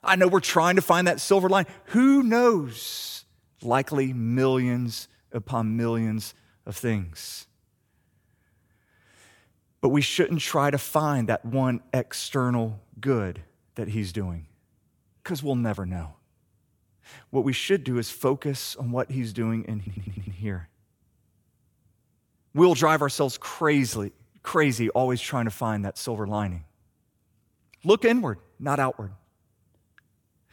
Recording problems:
audio stuttering; at 20 s

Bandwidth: 18.5 kHz